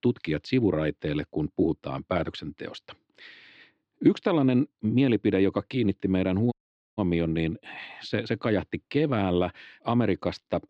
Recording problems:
muffled; very slightly; fading above 4 kHz
audio cutting out; at 6.5 s

